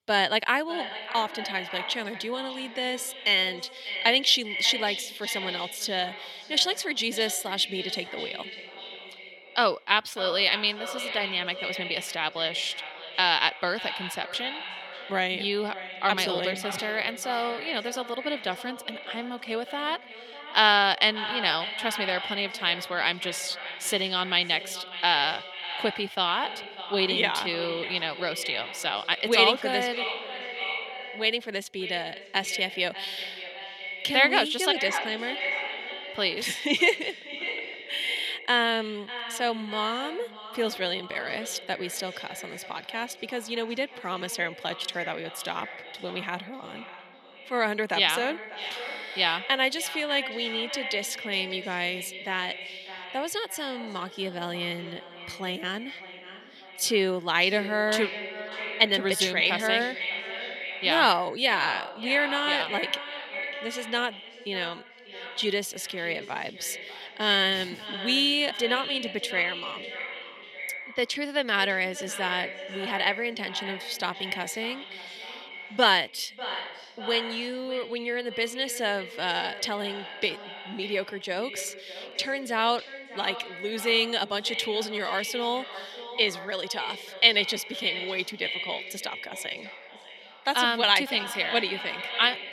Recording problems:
echo of what is said; strong; throughout; 590 ms later, 9 dB below the speech
thin; very slightly; fading below 450 Hz

